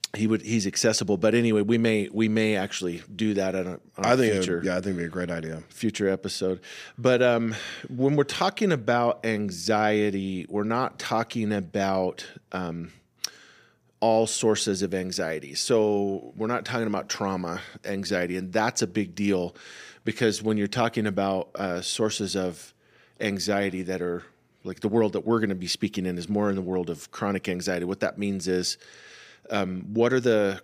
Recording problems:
none

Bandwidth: 15 kHz